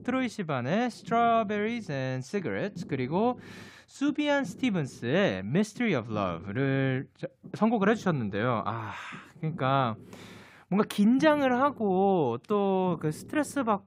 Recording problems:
low rumble; faint; throughout; 25 dB below the speech

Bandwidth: 15.5 kHz